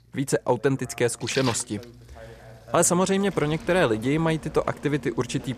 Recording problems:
rain or running water; noticeable; throughout; 15 dB below the speech
voice in the background; faint; throughout; 25 dB below the speech

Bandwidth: 14.5 kHz